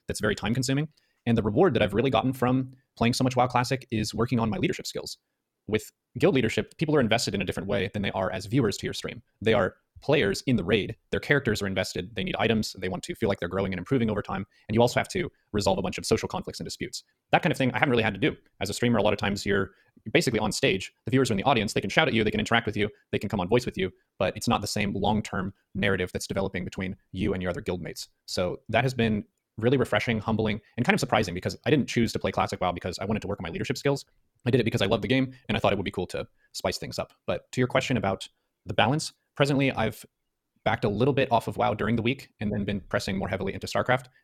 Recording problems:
wrong speed, natural pitch; too fast; 1.6 times normal speed

